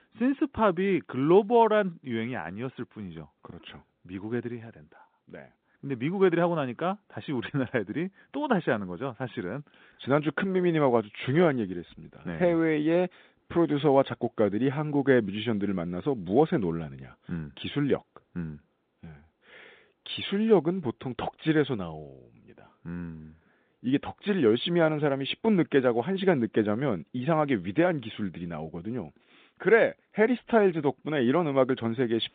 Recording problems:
phone-call audio; nothing above 3.5 kHz

